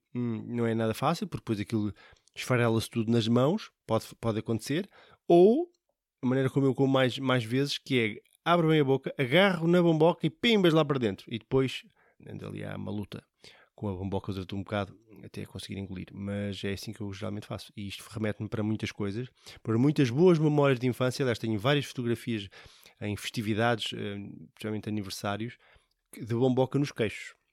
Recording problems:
none

